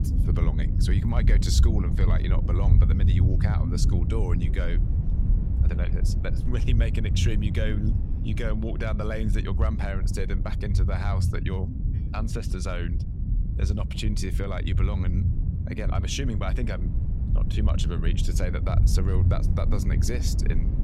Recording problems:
low rumble; loud; throughout; 5 dB below the speech

